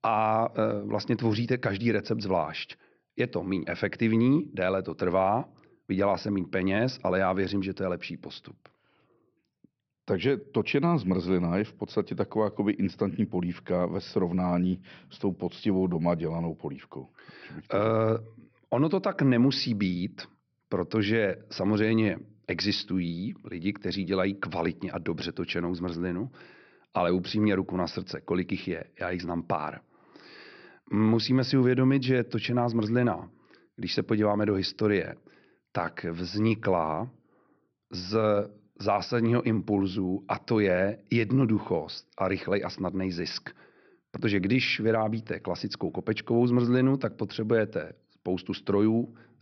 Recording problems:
high frequencies cut off; noticeable; nothing above 5.5 kHz

